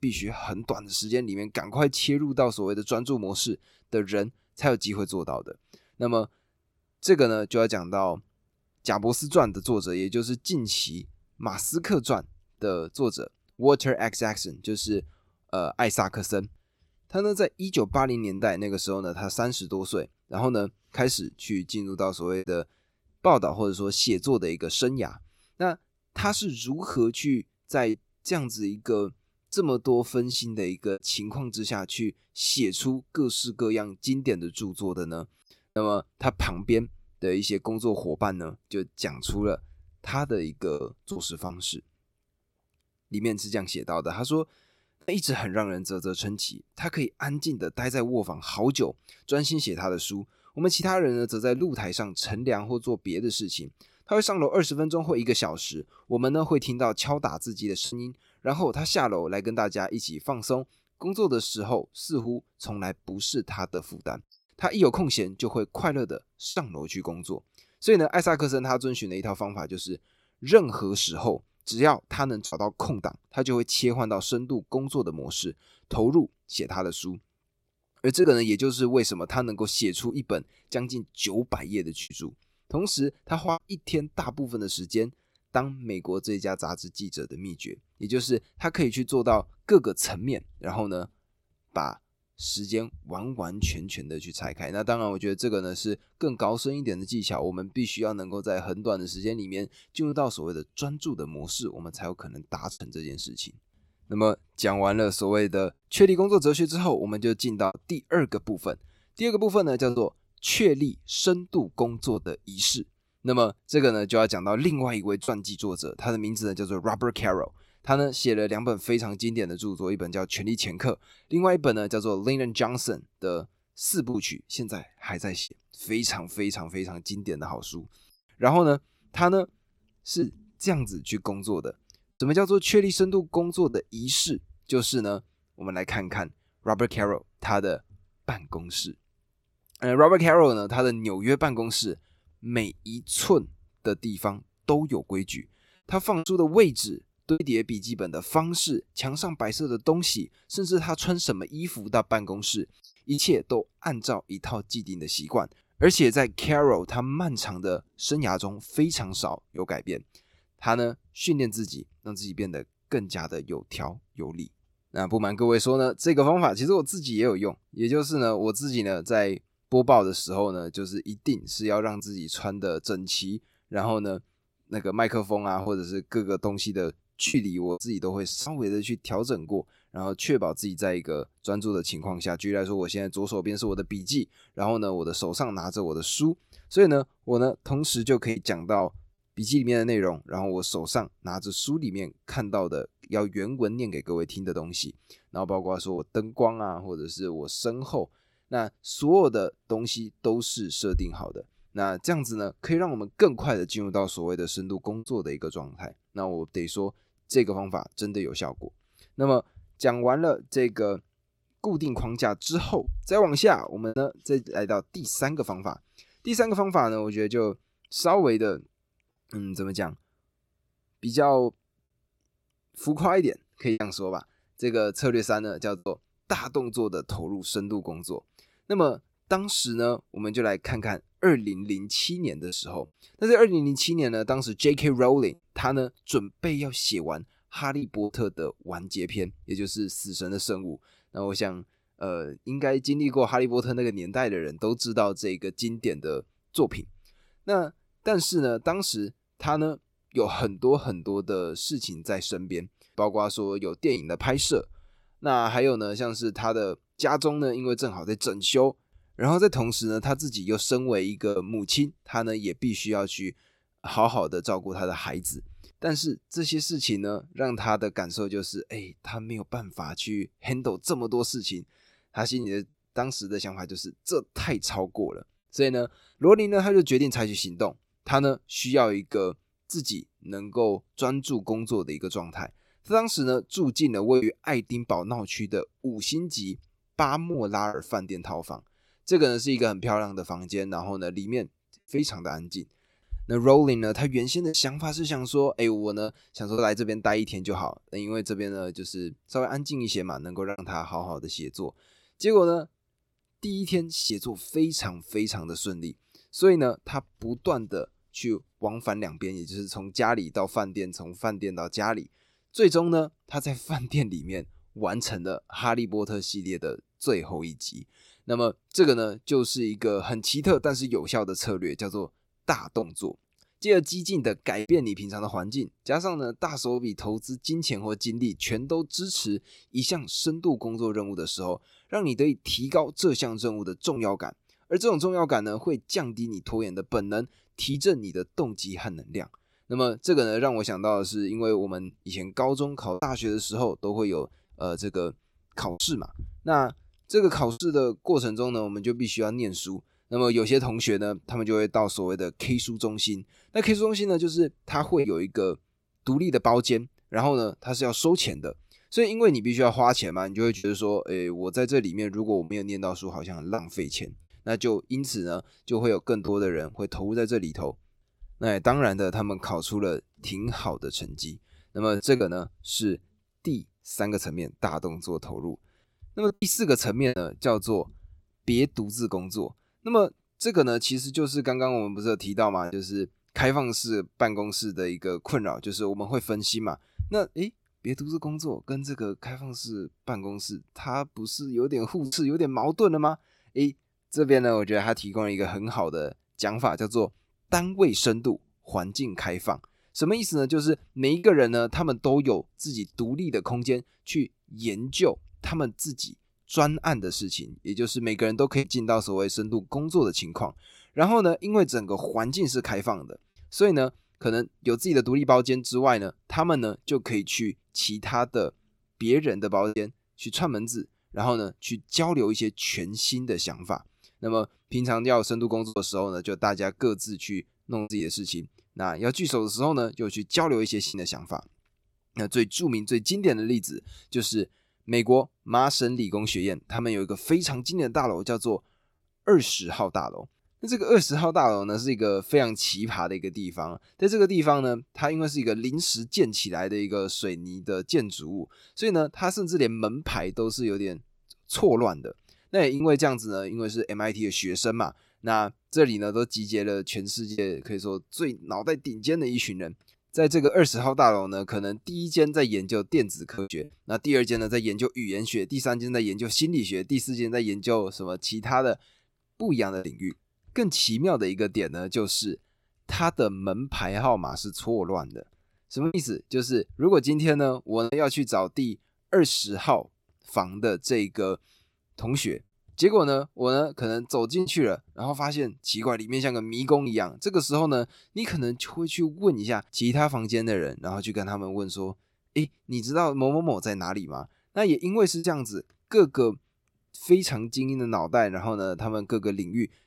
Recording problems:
choppy; occasionally; 1% of the speech affected

